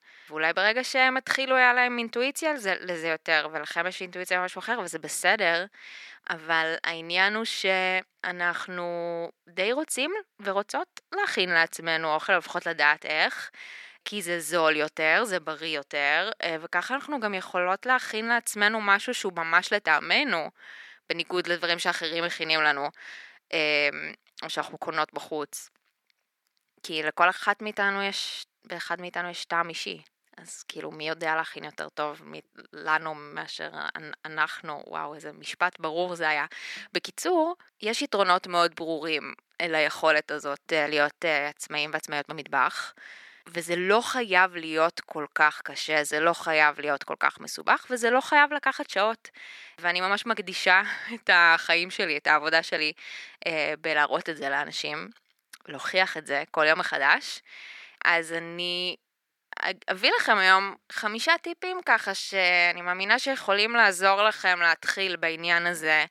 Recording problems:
thin; somewhat; fading below 300 Hz

